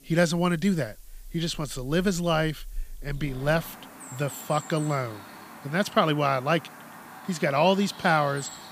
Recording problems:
animal sounds; noticeable; throughout; 15 dB below the speech
hiss; faint; throughout; 30 dB below the speech

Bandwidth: 15 kHz